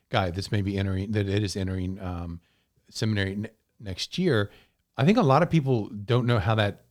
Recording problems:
none

